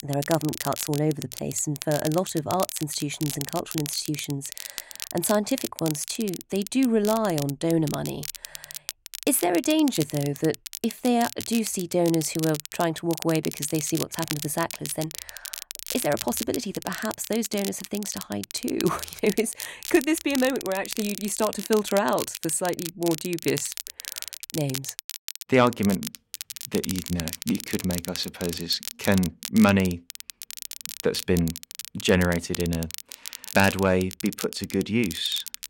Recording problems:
crackle, like an old record; loud; 9 dB below the speech

